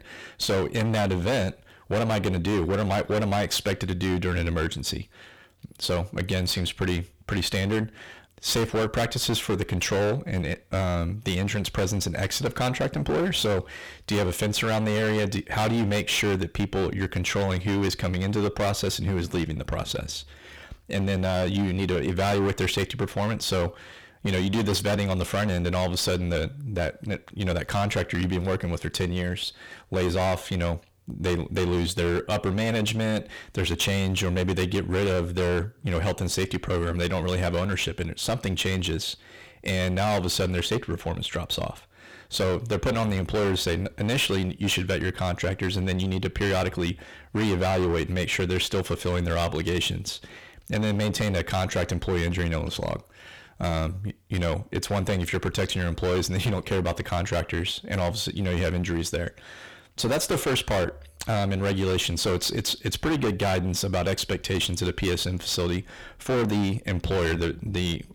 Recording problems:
distortion; heavy; 21% of the sound clipped

